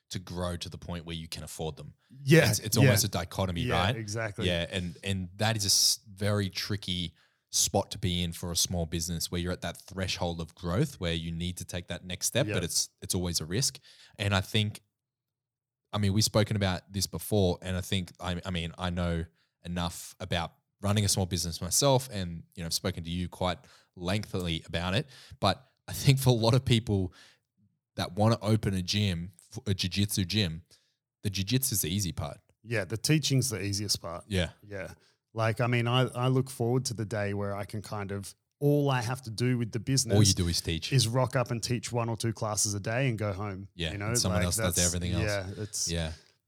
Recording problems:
none

